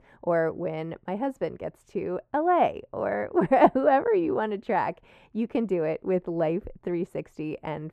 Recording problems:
muffled; very; fading above 2 kHz

